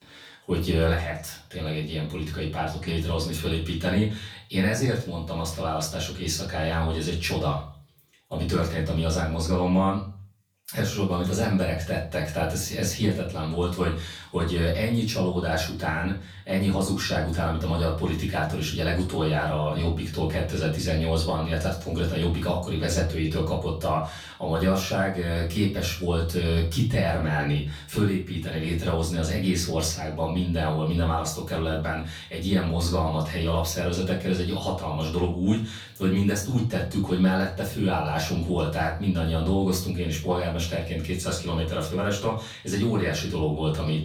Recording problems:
off-mic speech; far
room echo; slight; dies away in 0.4 s

